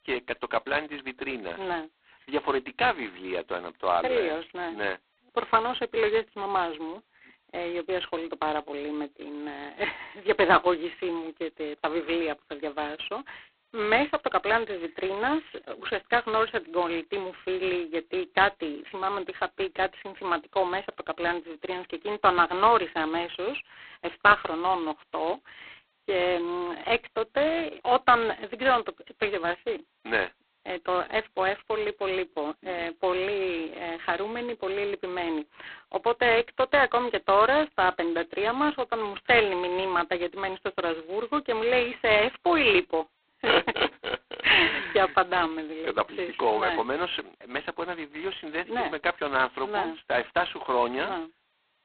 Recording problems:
phone-call audio; poor line; nothing above 4 kHz

